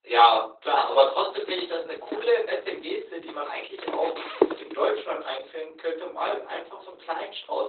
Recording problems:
off-mic speech; far
garbled, watery; badly; nothing above 4 kHz
thin; very; fading below 300 Hz
room echo; slight; dies away in 0.3 s
footsteps; loud; from 1.5 to 4.5 s; peak 1 dB above the speech

